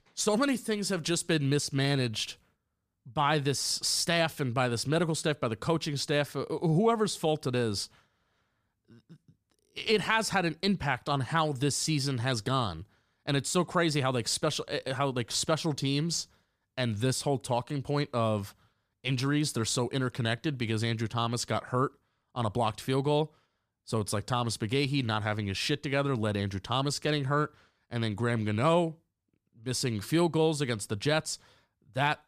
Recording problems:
none

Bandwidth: 15 kHz